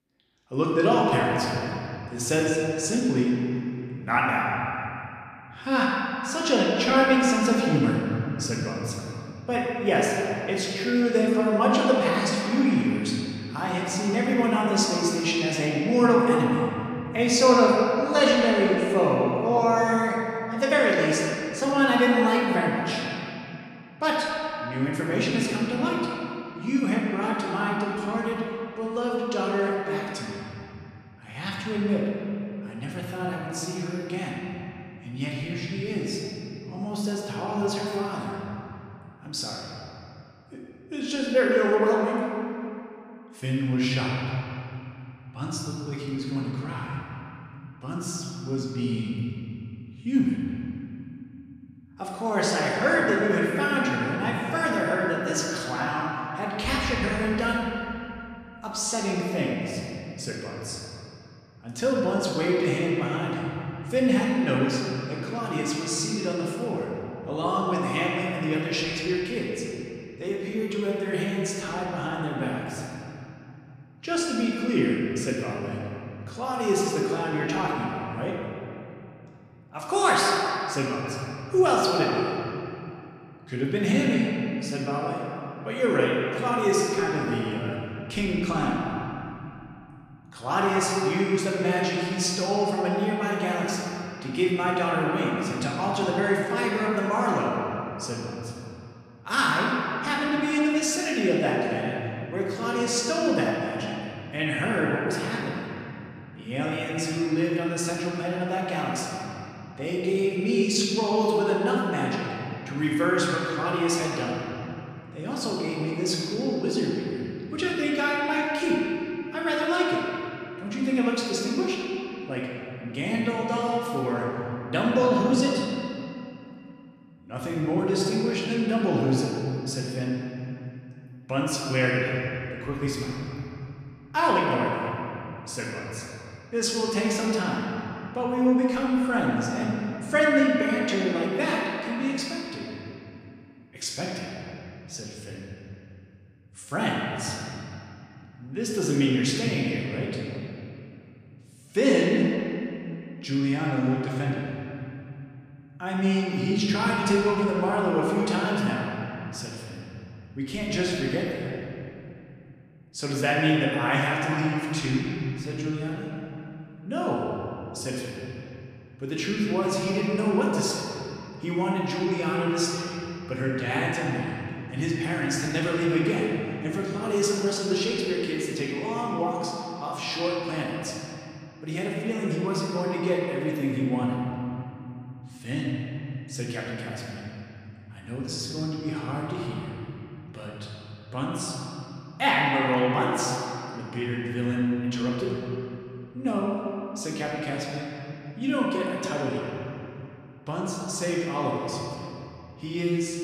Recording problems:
off-mic speech; far
room echo; noticeable; dies away in 2.8 s

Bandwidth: 14.5 kHz